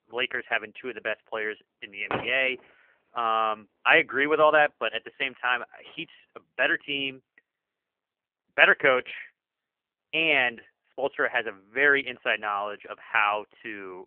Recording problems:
phone-call audio; poor line; nothing above 3 kHz
traffic noise; very faint; until 6.5 s; 10 dB below the speech

